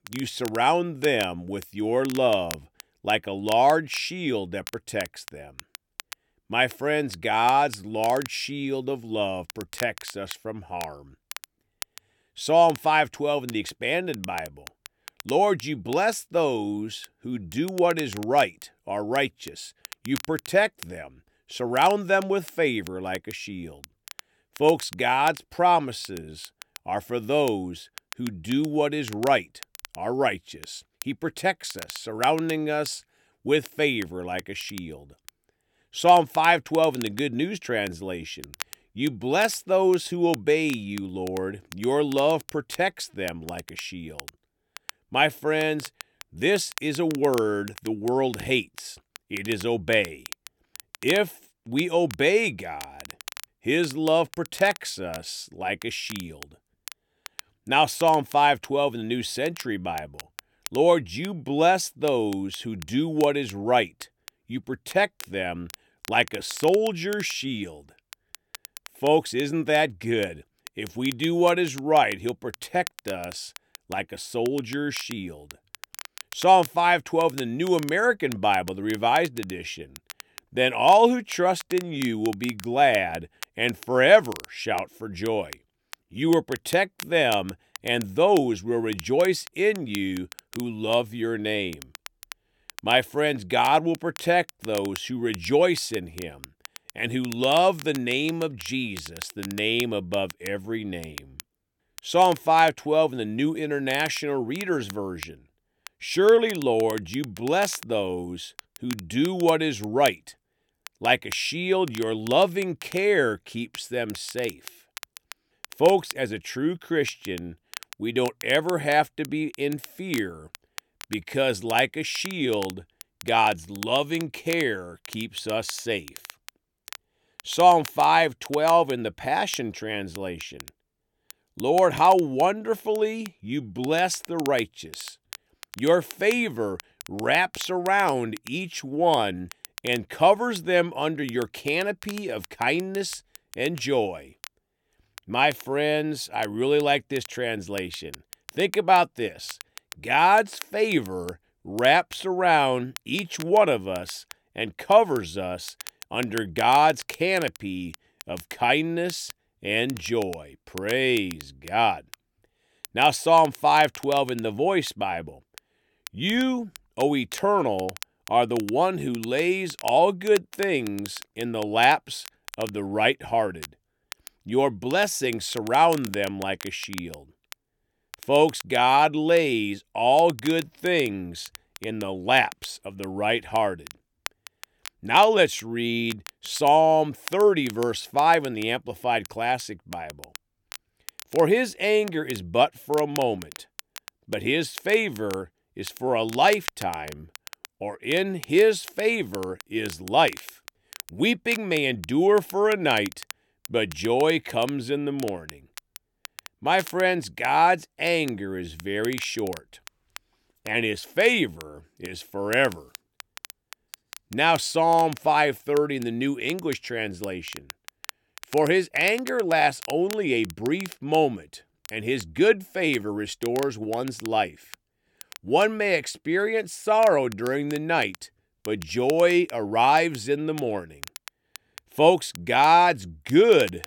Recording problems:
crackle, like an old record; noticeable; 20 dB below the speech

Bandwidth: 17.5 kHz